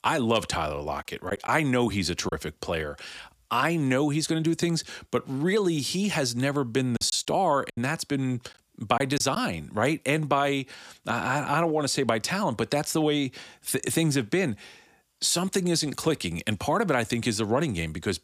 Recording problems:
choppy; very; from 1.5 to 2.5 s and from 7 to 9.5 s; 6% of the speech affected

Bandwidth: 15 kHz